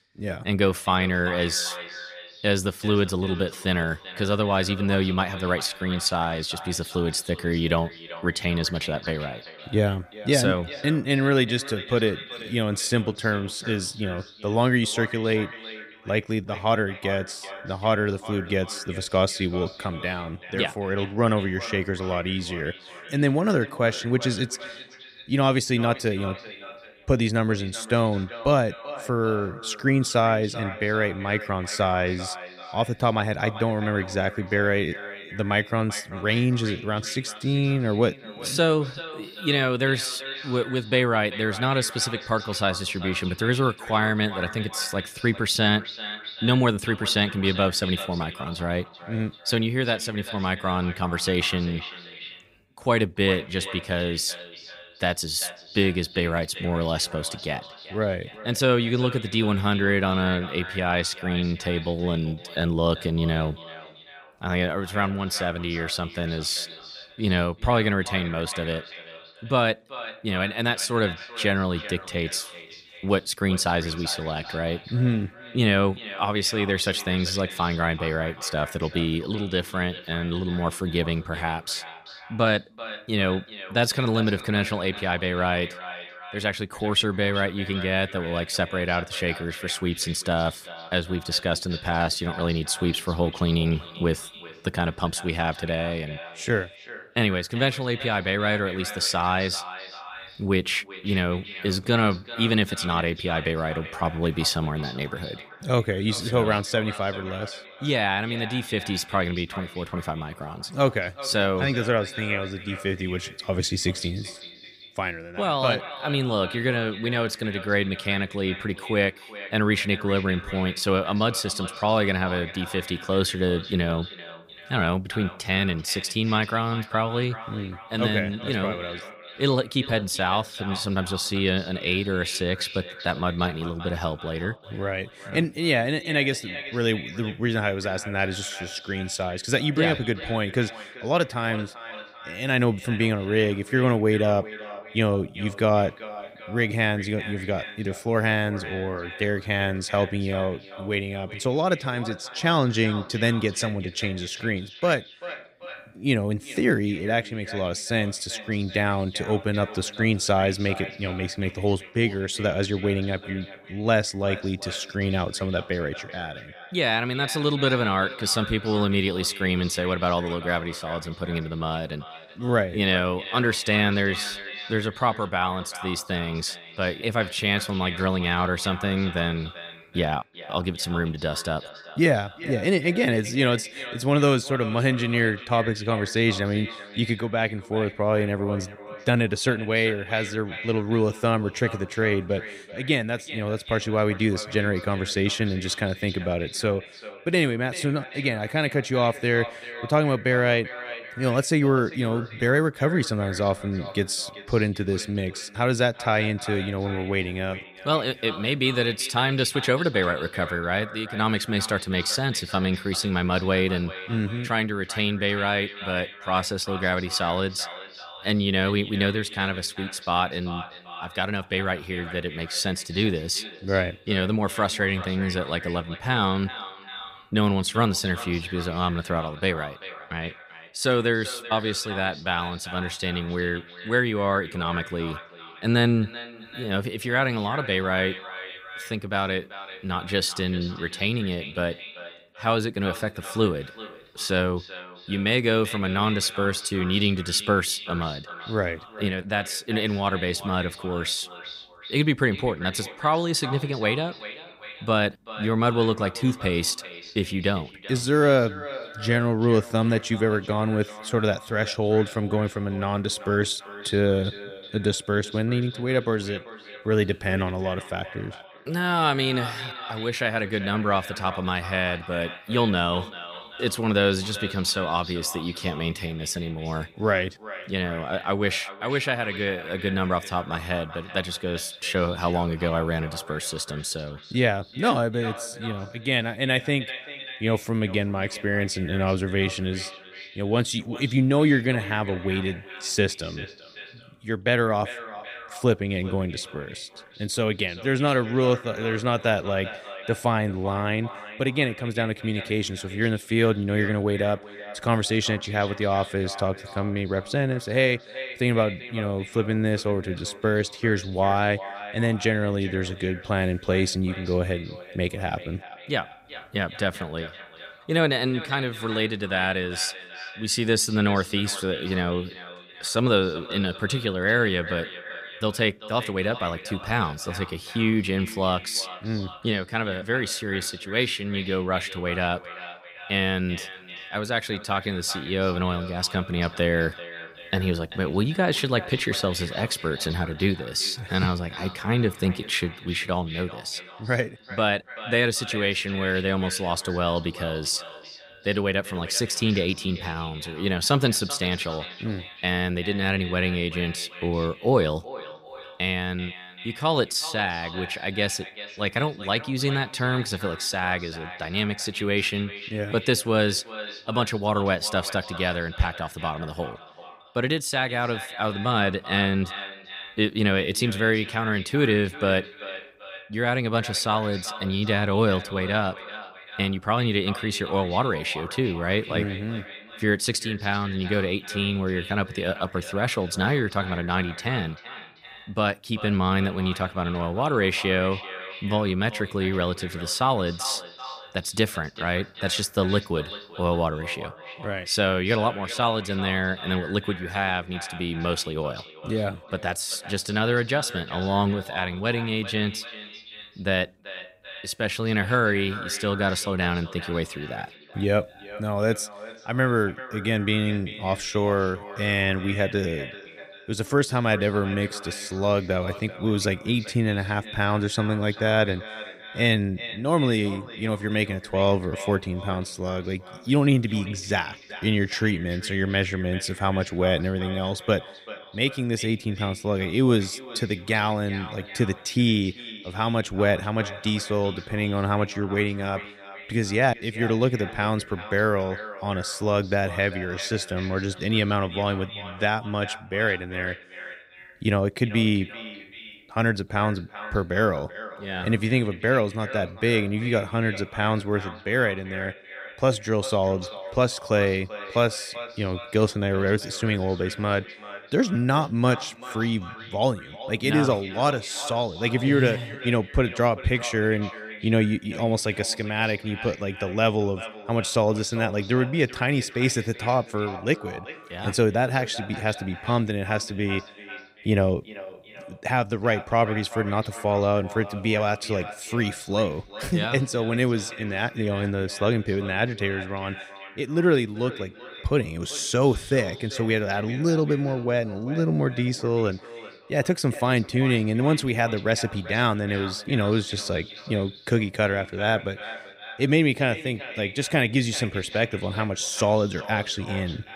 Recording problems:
echo of what is said; noticeable; throughout; 390 ms later, 15 dB below the speech

